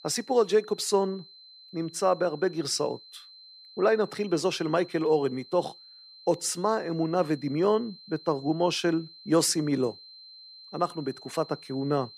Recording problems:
high-pitched whine; noticeable; throughout; 4 kHz, 20 dB below the speech

